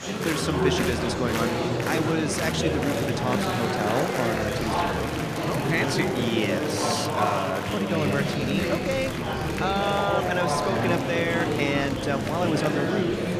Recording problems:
murmuring crowd; very loud; throughout; 2 dB above the speech

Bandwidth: 14.5 kHz